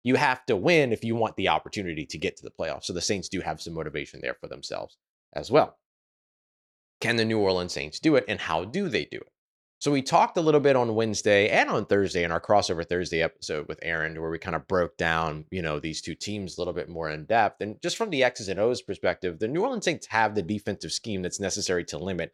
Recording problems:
none

